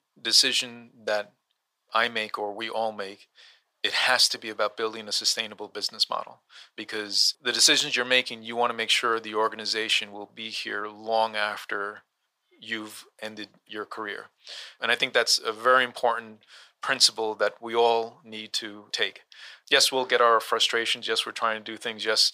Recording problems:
thin; very; fading below 450 Hz

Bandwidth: 15 kHz